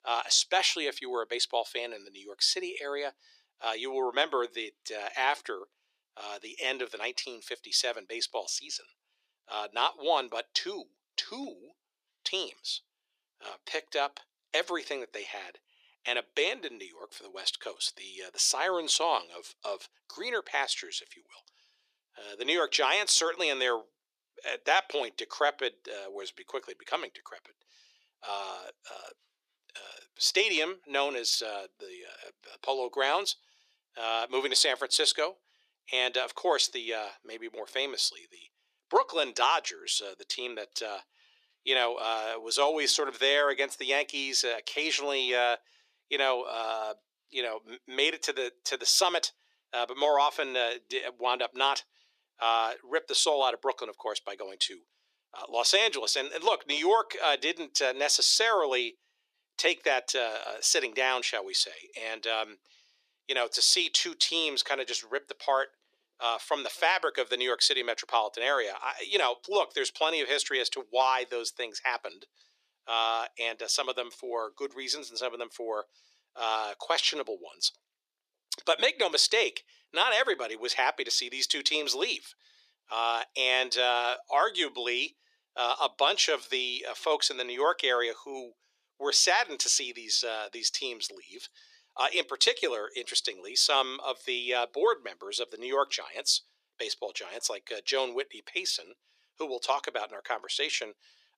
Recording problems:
thin; very; fading below 350 Hz

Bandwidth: 14 kHz